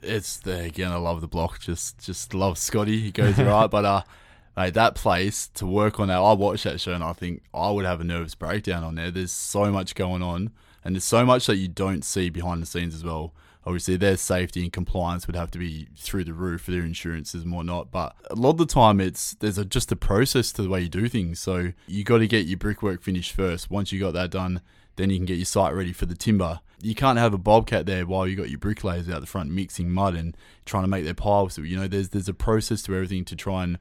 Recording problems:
none

